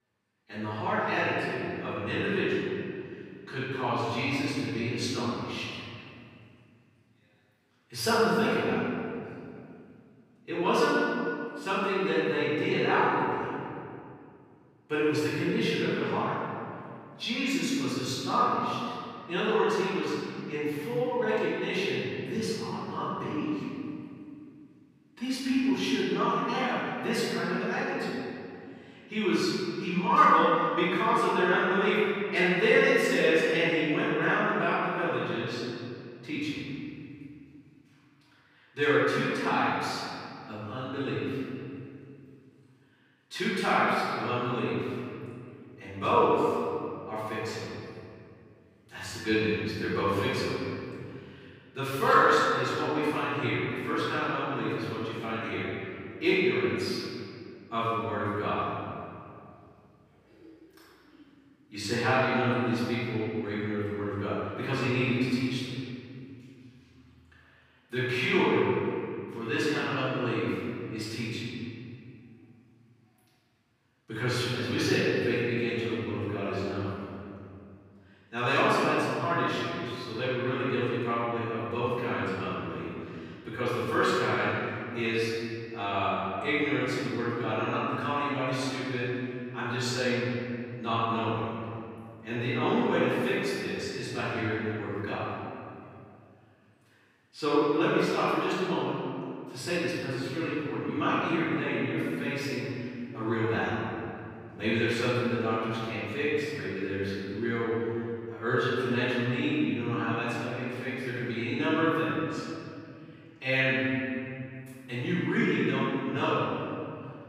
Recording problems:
room echo; strong; dies away in 2.5 s
off-mic speech; far

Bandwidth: 15.5 kHz